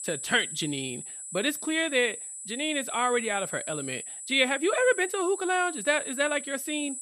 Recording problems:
high-pitched whine; loud; throughout; 8 kHz, 8 dB below the speech

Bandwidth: 15 kHz